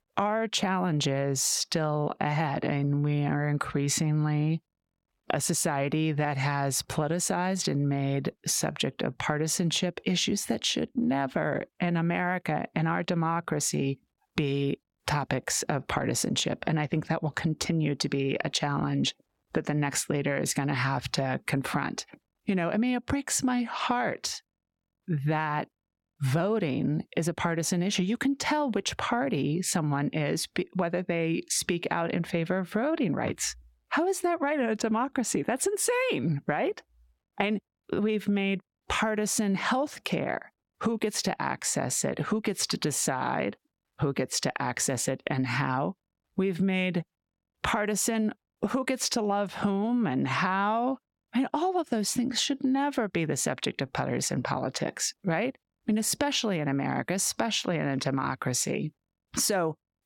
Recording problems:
squashed, flat; heavily

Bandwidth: 17.5 kHz